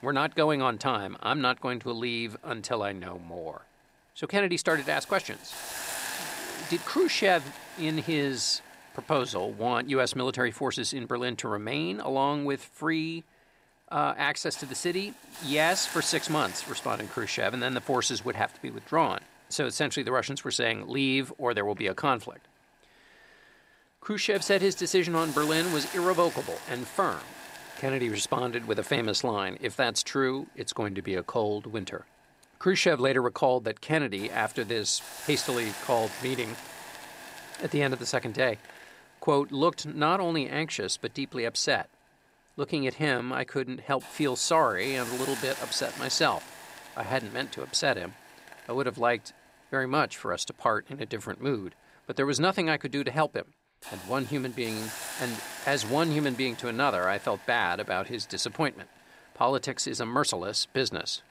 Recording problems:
hiss; noticeable; throughout; 10 dB below the speech

